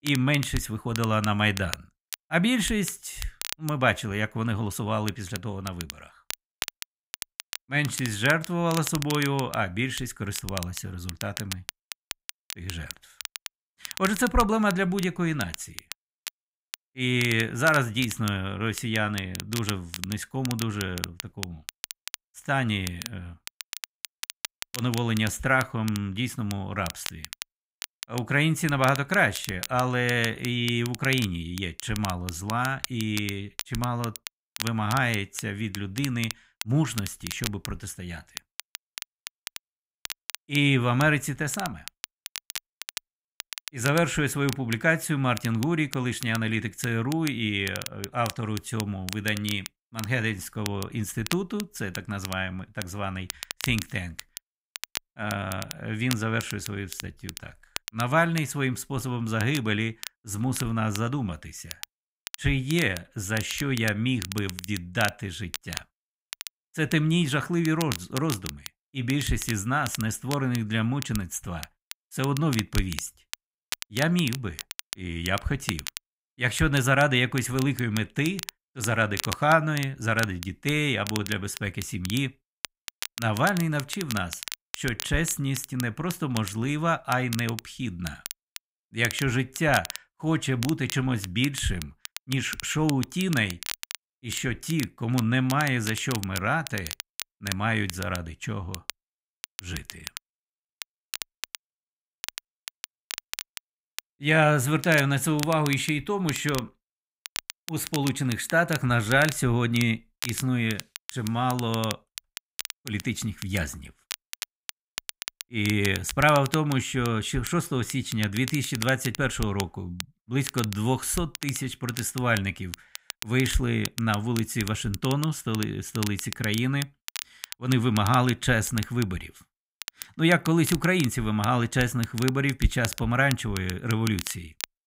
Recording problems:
crackle, like an old record; noticeable; 10 dB below the speech

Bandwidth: 15.5 kHz